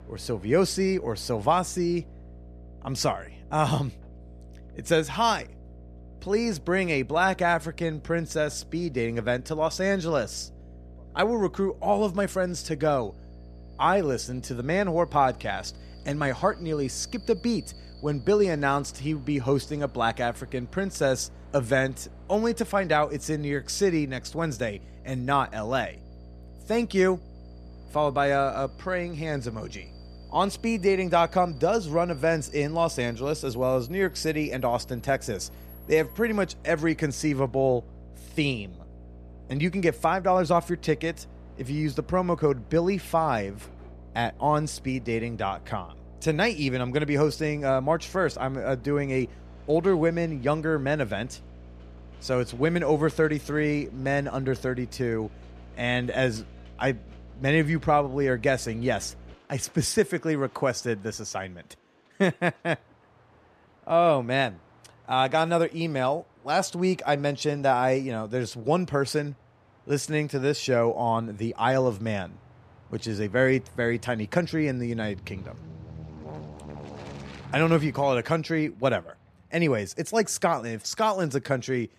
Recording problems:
electrical hum; faint; until 59 s; 60 Hz, 30 dB below the speech
train or aircraft noise; faint; throughout; 25 dB below the speech

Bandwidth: 14.5 kHz